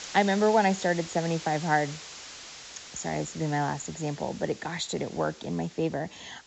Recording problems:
high frequencies cut off; noticeable; nothing above 7.5 kHz
hiss; noticeable; throughout; 15 dB below the speech

